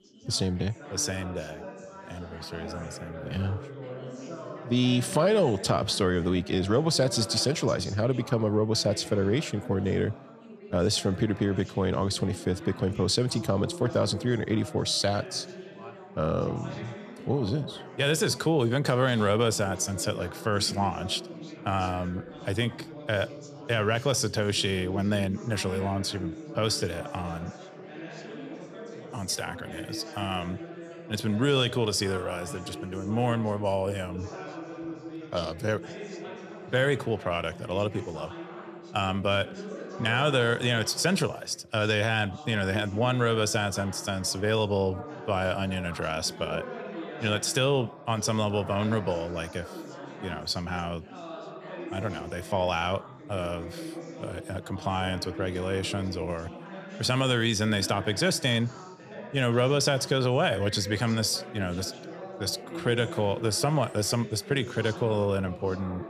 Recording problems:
background chatter; noticeable; throughout; 4 voices, 15 dB below the speech

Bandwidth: 14.5 kHz